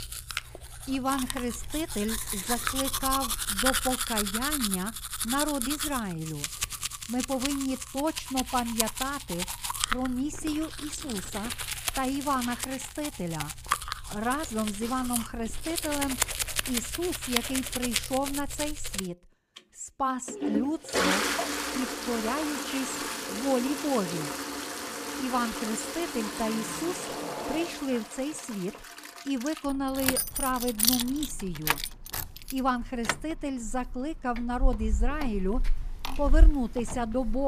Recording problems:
household noises; very loud; throughout; 1 dB above the speech
abrupt cut into speech; at the end

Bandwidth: 15 kHz